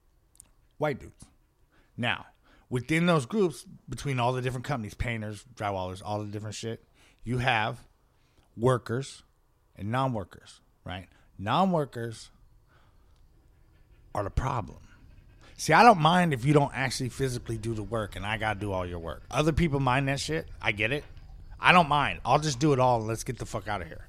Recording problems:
animal sounds; faint; throughout; 25 dB below the speech

